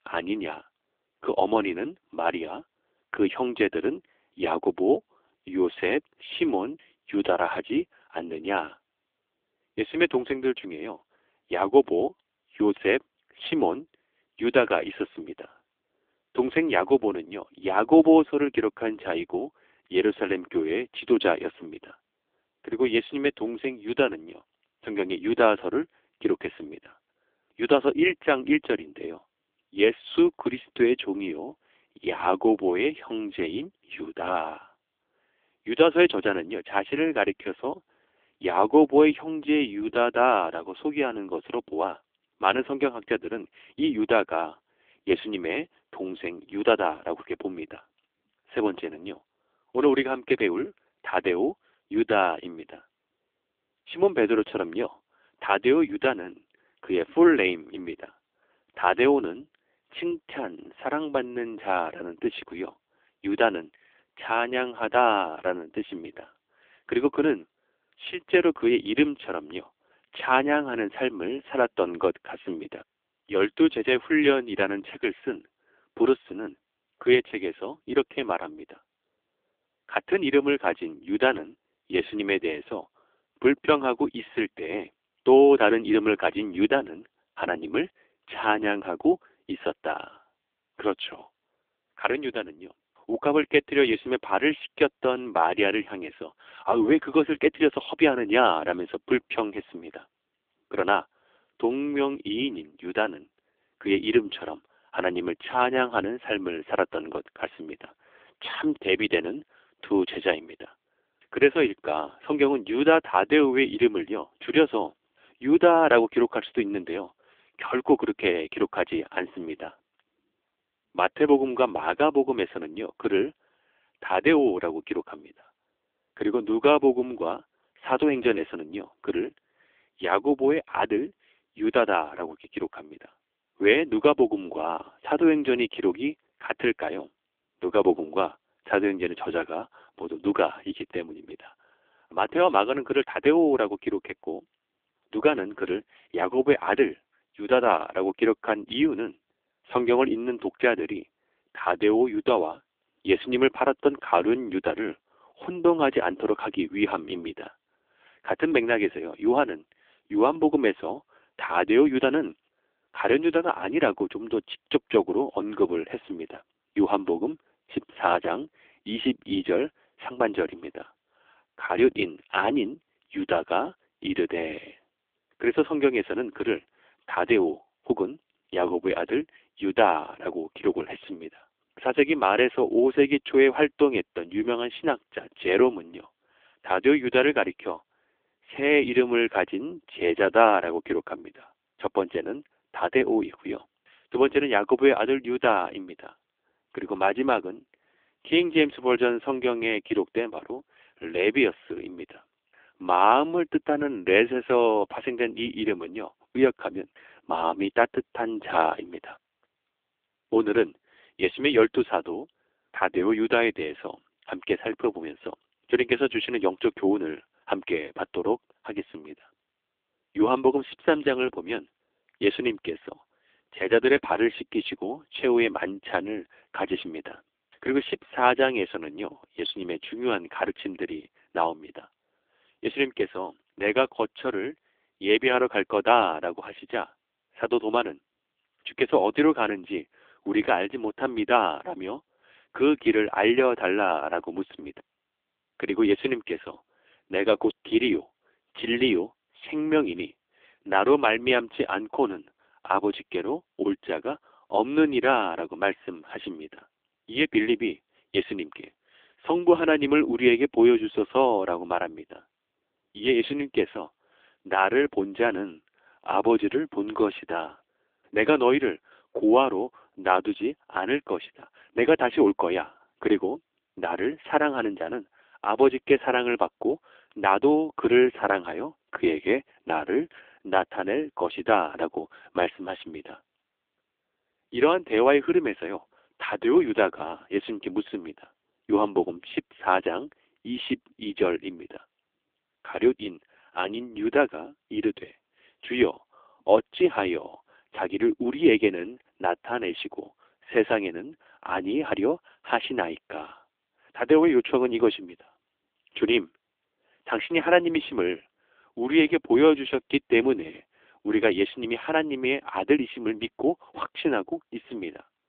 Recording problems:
phone-call audio; poor line; nothing above 3.5 kHz

